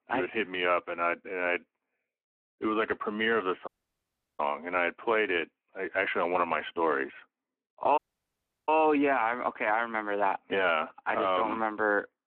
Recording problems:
phone-call audio
audio cutting out; at 3.5 s for 0.5 s and at 8 s for 0.5 s

